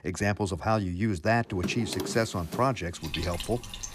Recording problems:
household noises; loud; from 2 s on; 8 dB below the speech

